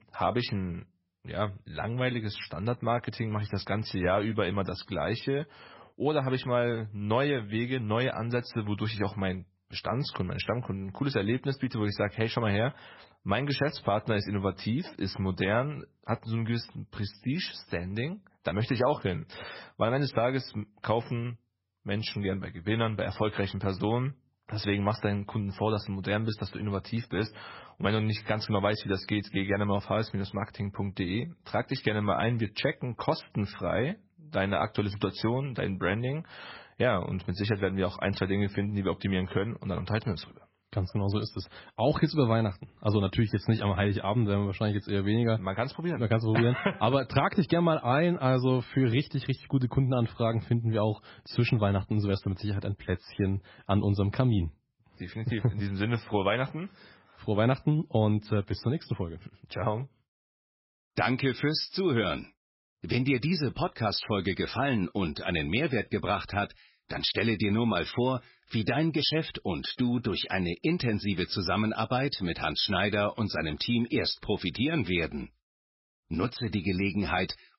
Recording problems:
garbled, watery; badly; nothing above 5.5 kHz

